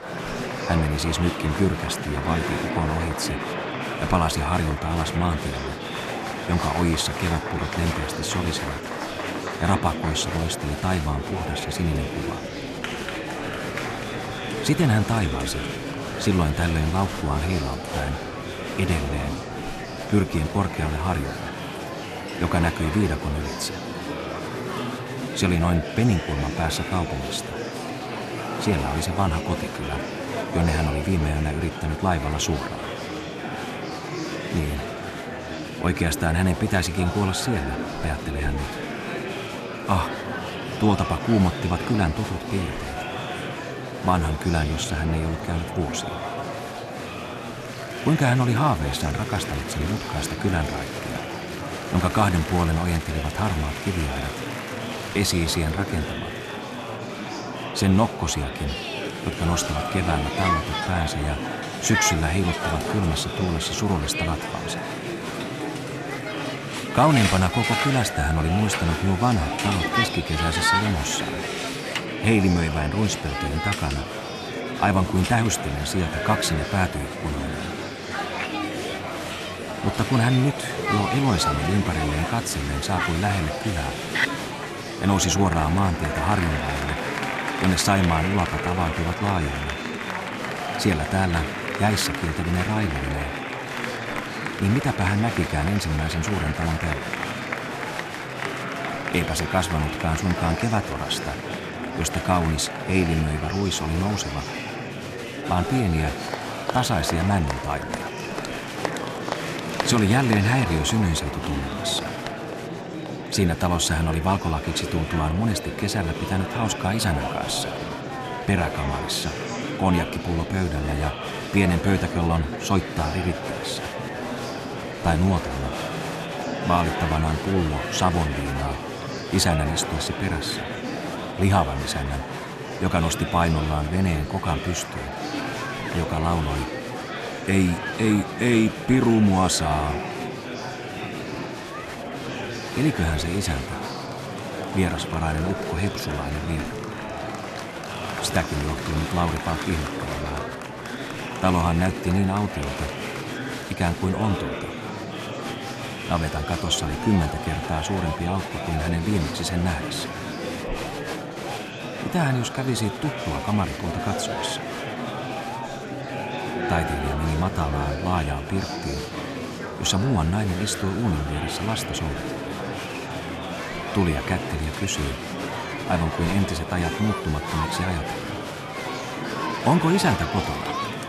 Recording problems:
murmuring crowd; loud; throughout; 5 dB below the speech

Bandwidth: 13.5 kHz